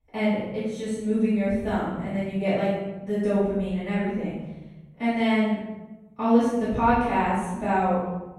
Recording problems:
room echo; strong; dies away in 1.1 s
off-mic speech; far

